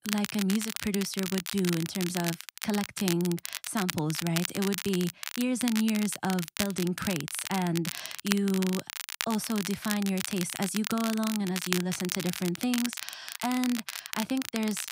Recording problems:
crackle, like an old record; loud; 5 dB below the speech

